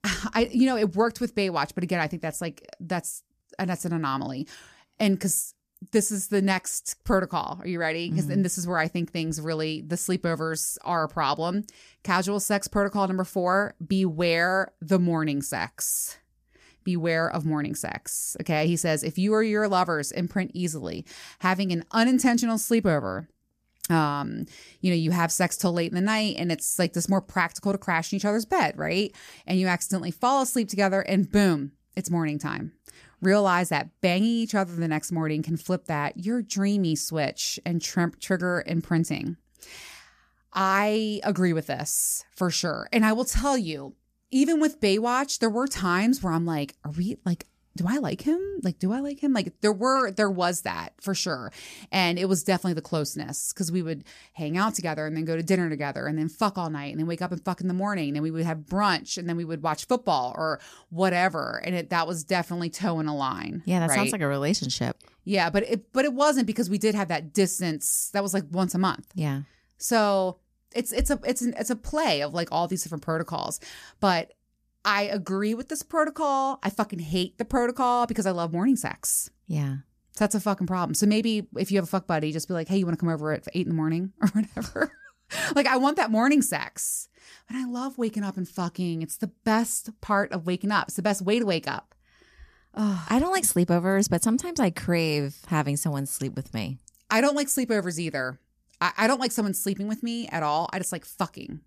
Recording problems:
none

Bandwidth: 14.5 kHz